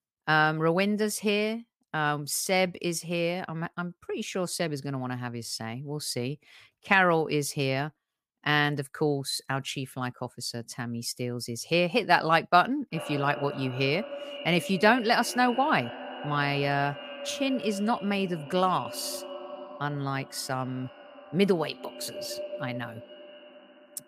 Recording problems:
echo of what is said; noticeable; from 13 s on; 120 ms later, 15 dB below the speech

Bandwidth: 15 kHz